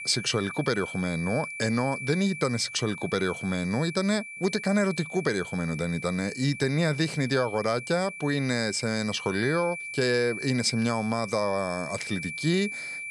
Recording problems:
high-pitched whine; loud; throughout; 2.5 kHz, 9 dB below the speech

